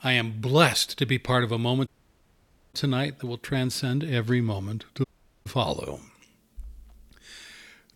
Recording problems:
audio cutting out; at 2 s for 1 s and at 5 s

